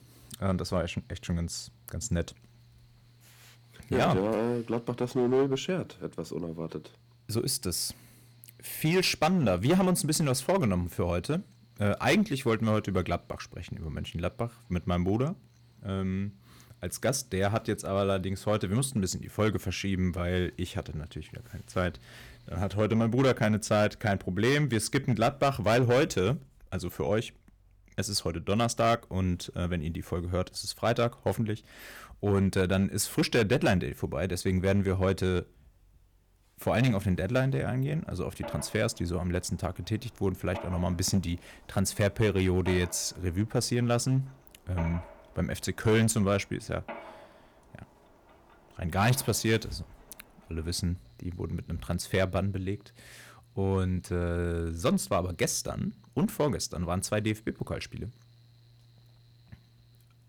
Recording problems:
distortion; slight; 3% of the sound clipped
machinery noise; faint; throughout; 25 dB below the speech

